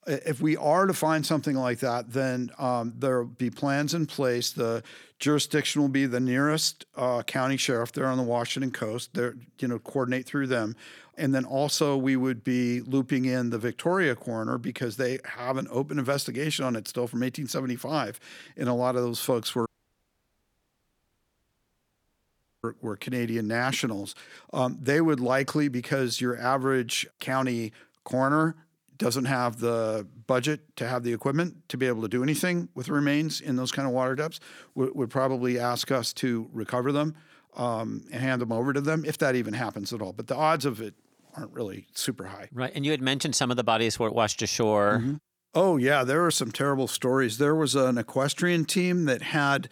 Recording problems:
audio cutting out; at 20 s for 3 s

